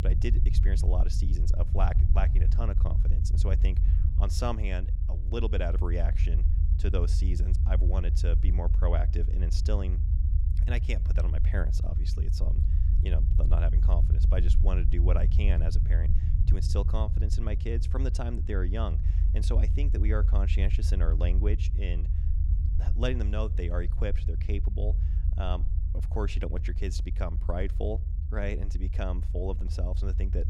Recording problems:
low rumble; loud; throughout; 8 dB below the speech

